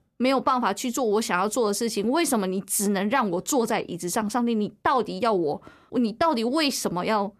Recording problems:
none

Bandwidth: 14 kHz